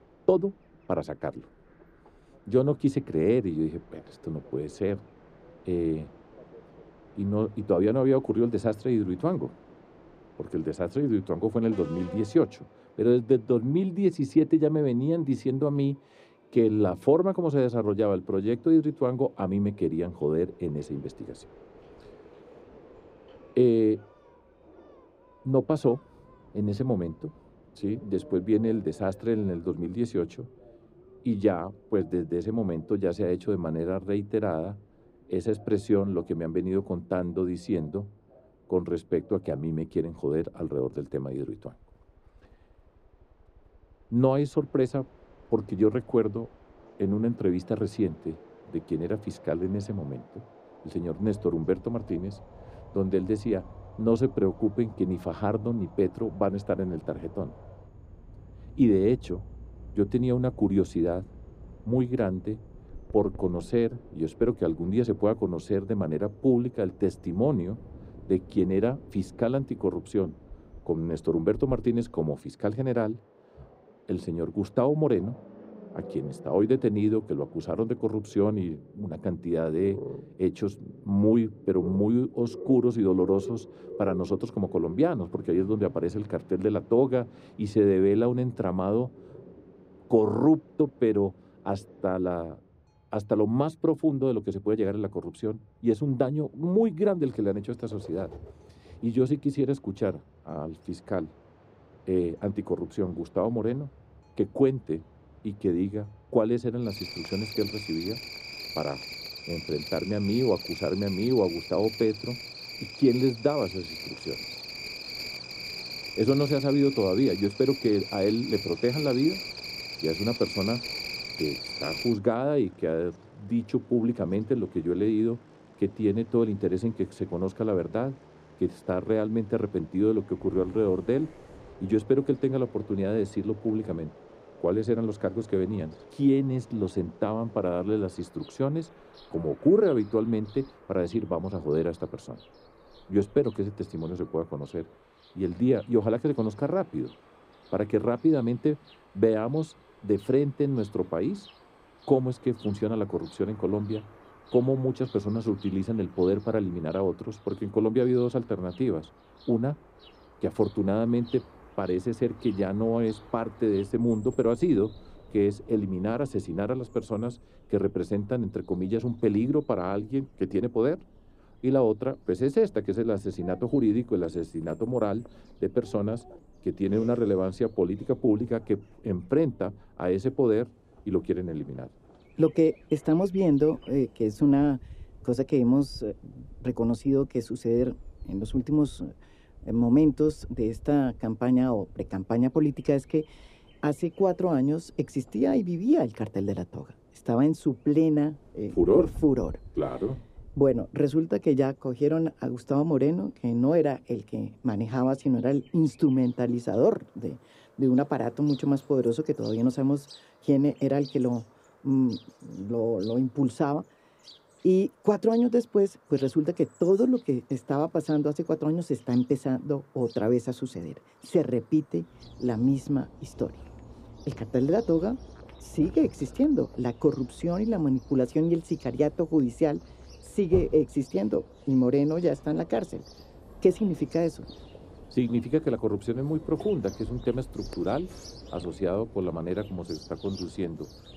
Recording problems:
muffled; very; fading above 1 kHz
animal sounds; noticeable; throughout; 15 dB below the speech
train or aircraft noise; faint; until 2:47; 25 dB below the speech

